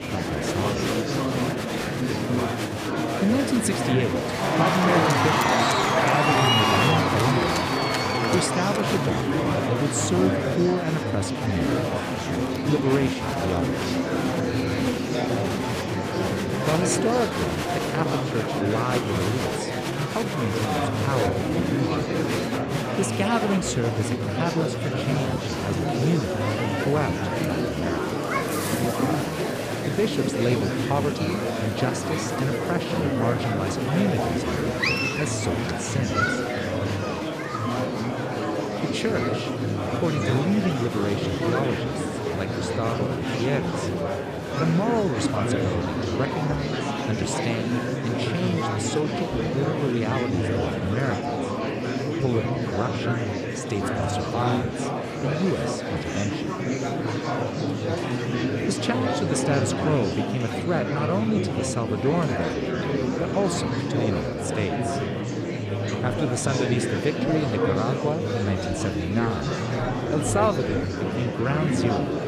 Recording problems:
murmuring crowd; very loud; throughout; 2 dB above the speech

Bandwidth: 15 kHz